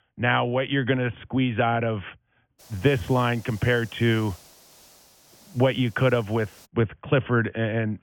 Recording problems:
high frequencies cut off; severe; nothing above 3.5 kHz
hiss; faint; from 2.5 to 6.5 s; 25 dB below the speech

